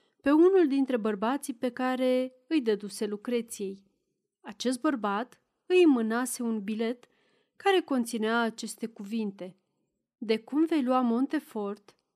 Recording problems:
none

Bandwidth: 14.5 kHz